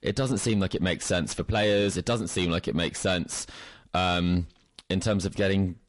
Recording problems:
distortion; slight; 10 dB below the speech
garbled, watery; slightly; nothing above 11 kHz

